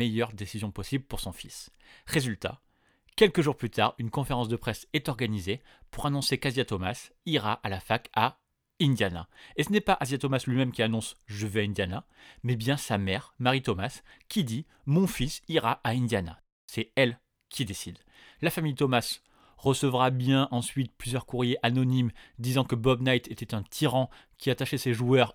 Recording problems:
abrupt cut into speech; at the start

